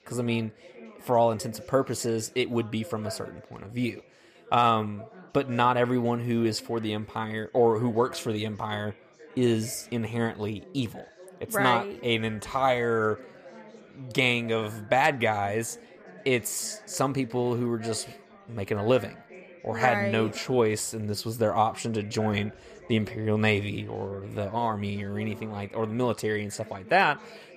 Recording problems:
chatter from many people; noticeable; throughout; 20 dB below the speech

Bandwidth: 14.5 kHz